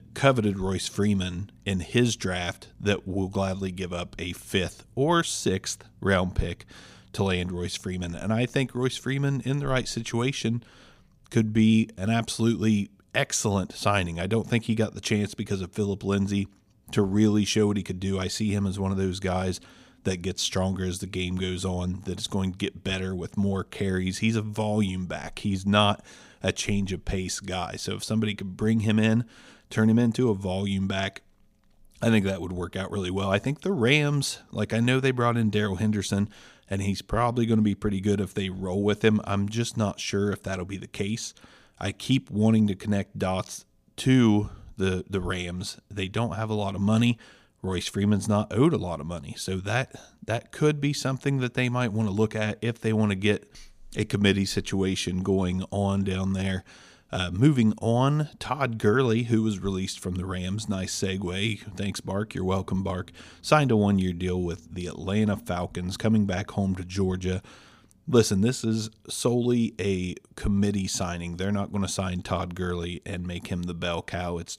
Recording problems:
none

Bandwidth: 15 kHz